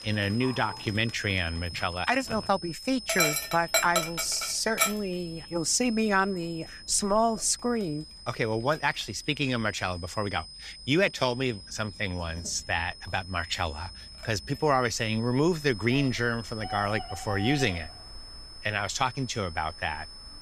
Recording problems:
animal sounds; loud; throughout; 3 dB below the speech
high-pitched whine; noticeable; throughout; 5 kHz, 15 dB below the speech

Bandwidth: 14.5 kHz